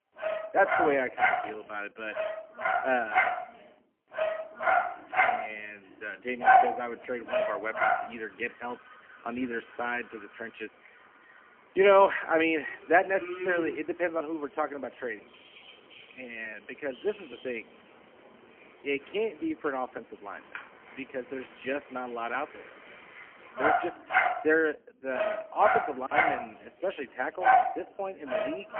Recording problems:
phone-call audio; poor line; nothing above 3 kHz
animal sounds; very loud; throughout; 2 dB above the speech

